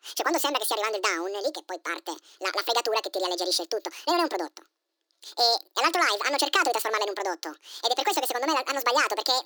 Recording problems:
thin; very; fading below 300 Hz
wrong speed and pitch; too fast and too high; 1.7 times normal speed

